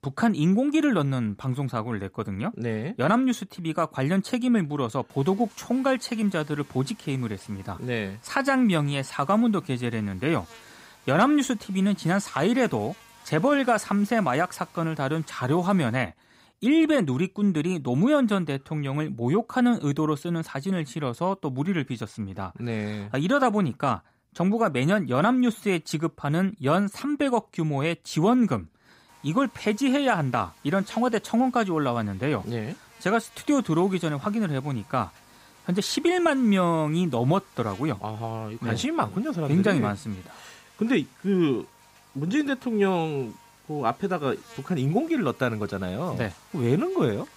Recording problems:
electrical hum; faint; from 5 to 16 s and from 29 s on; 50 Hz, 25 dB below the speech

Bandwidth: 15.5 kHz